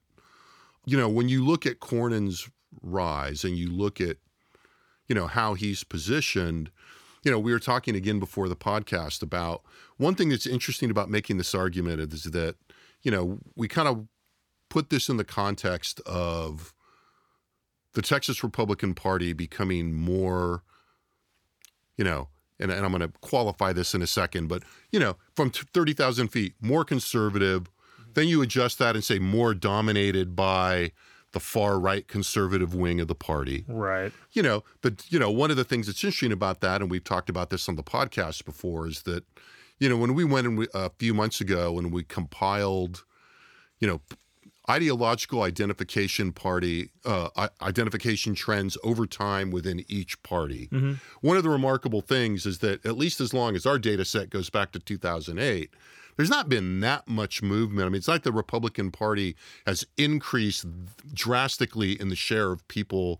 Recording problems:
none

